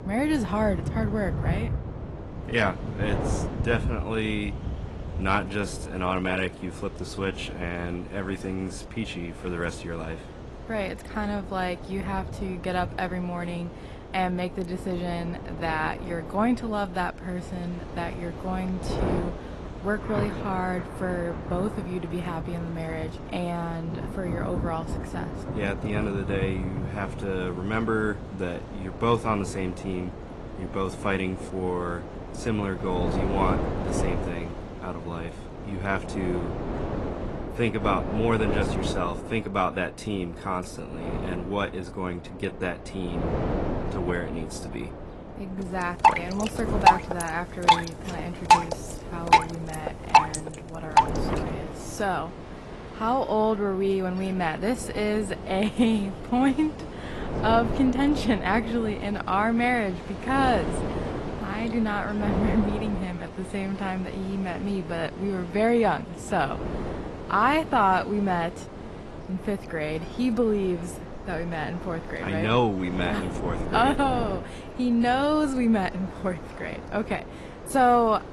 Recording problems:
distortion; slight; 10 dB below the speech
garbled, watery; slightly; nothing above 11.5 kHz
rain or running water; loud; throughout; 2 dB below the speech
wind noise on the microphone; occasional gusts; 10 dB below the speech

